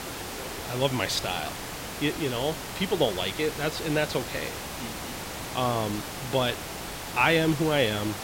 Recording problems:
hiss; loud; throughout; 7 dB below the speech

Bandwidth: 16 kHz